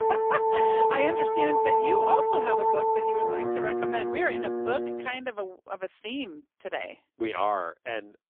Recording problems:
phone-call audio; poor line; nothing above 3 kHz
background music; very loud; until 5 s; 5 dB above the speech

